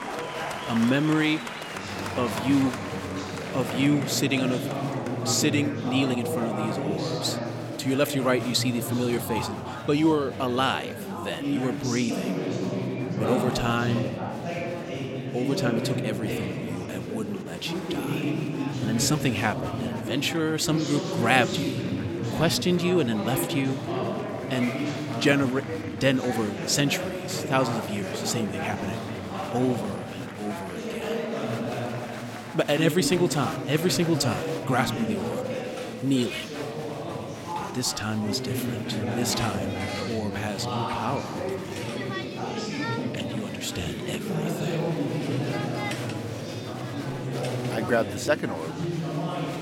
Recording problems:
chatter from many people; loud; throughout; 4 dB below the speech

